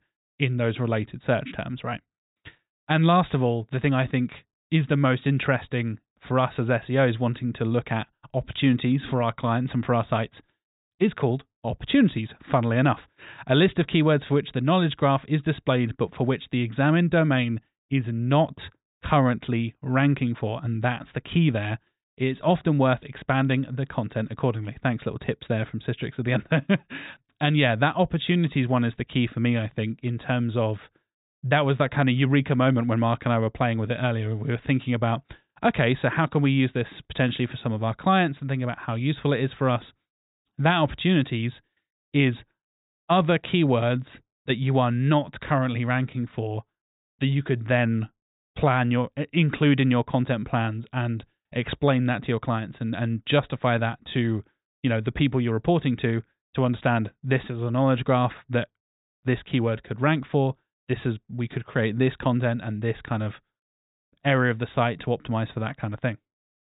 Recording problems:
high frequencies cut off; severe; nothing above 4 kHz

